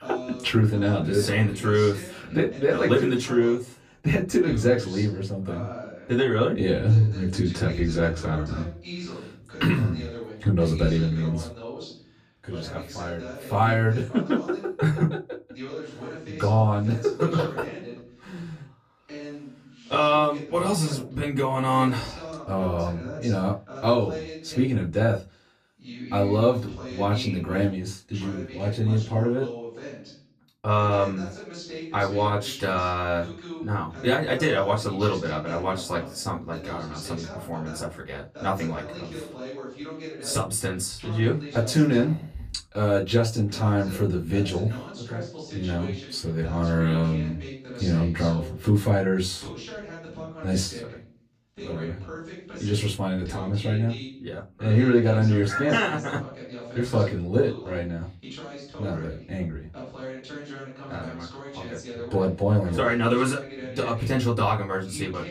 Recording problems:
off-mic speech; far
room echo; very slight; dies away in 0.2 s
voice in the background; noticeable; throughout; 15 dB below the speech

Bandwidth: 14.5 kHz